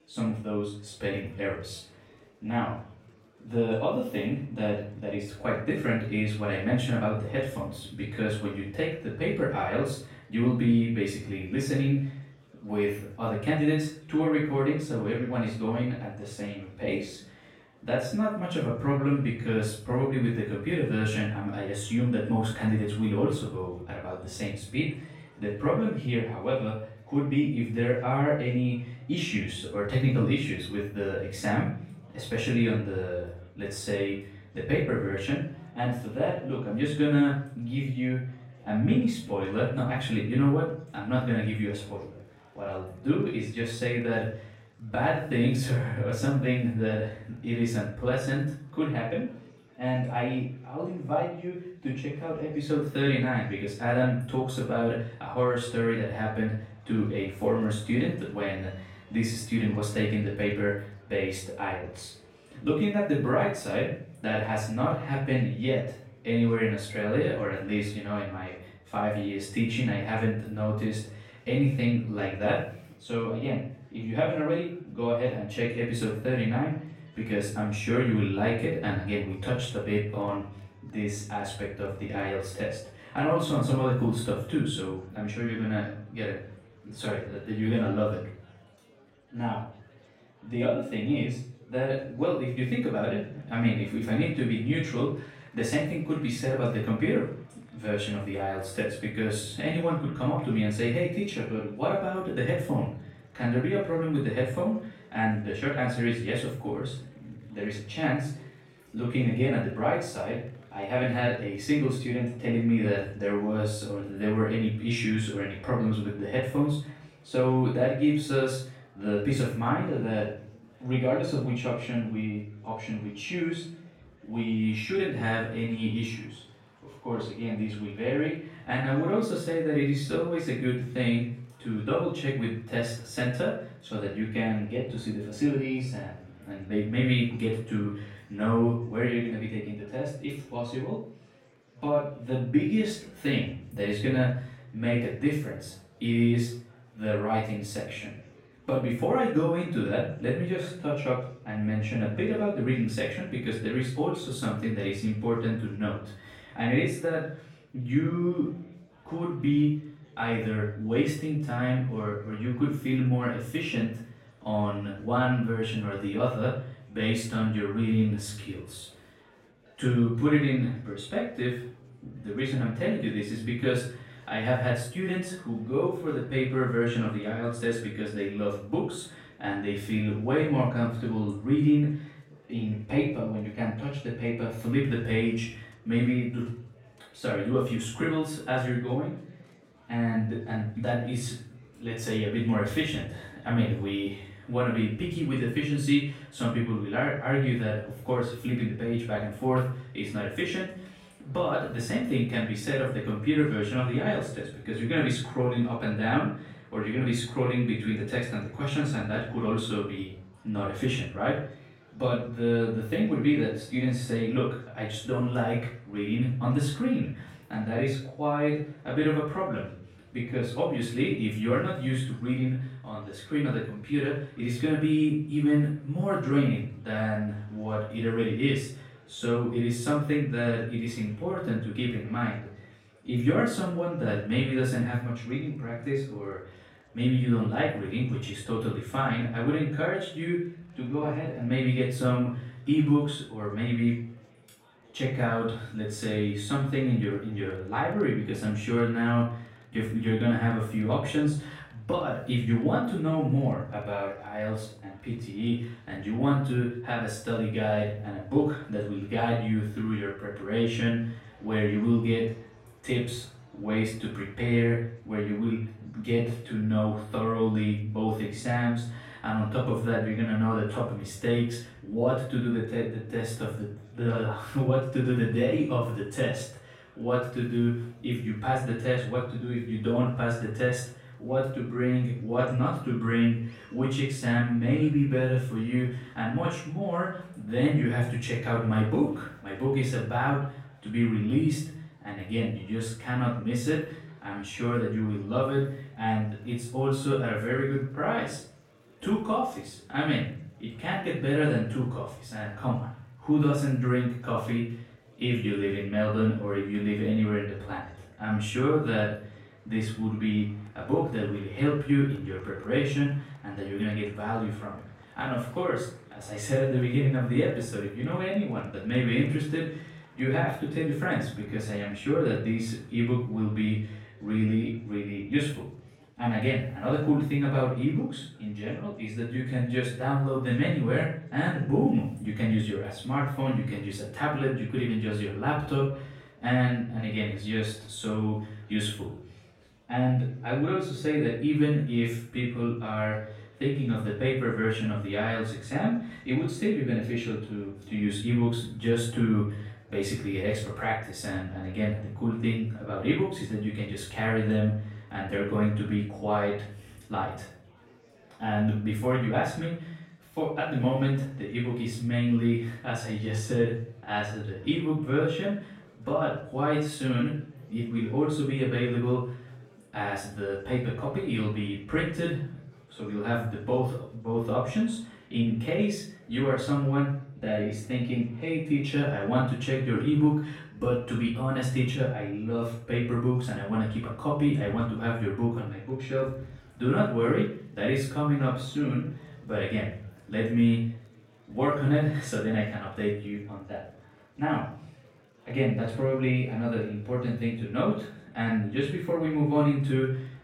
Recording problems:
off-mic speech; far
room echo; noticeable; dies away in 0.5 s
murmuring crowd; faint; throughout; 30 dB below the speech

